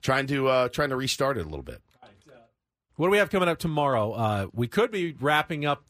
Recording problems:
none

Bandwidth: 15 kHz